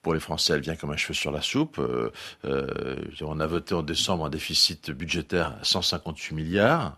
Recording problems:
none

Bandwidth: 13.5 kHz